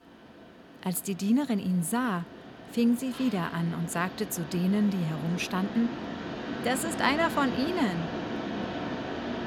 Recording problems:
machinery noise; loud; throughout; 8 dB below the speech

